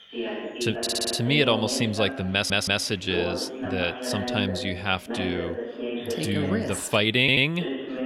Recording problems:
voice in the background; loud; throughout; 8 dB below the speech
audio stuttering; at 1 s, at 2.5 s and at 7 s

